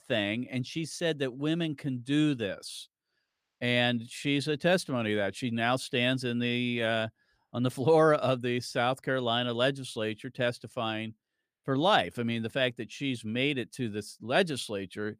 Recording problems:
none

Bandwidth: 15 kHz